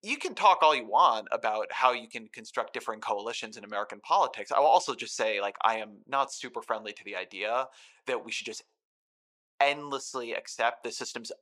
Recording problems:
thin; very; fading below 600 Hz

